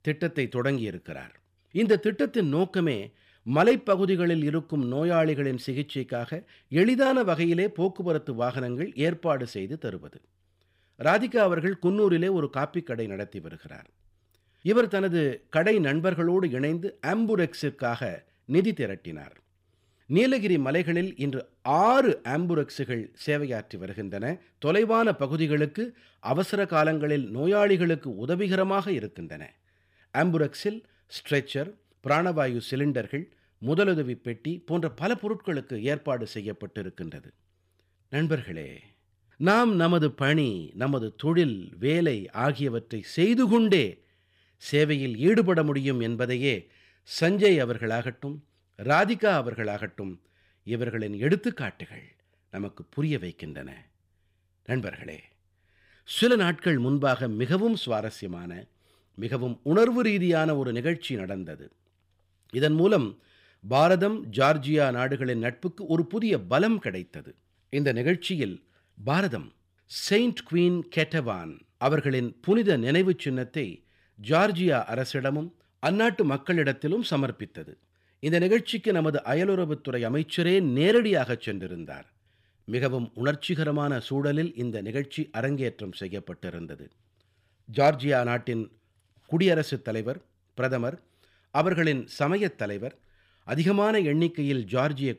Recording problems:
none

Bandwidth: 15.5 kHz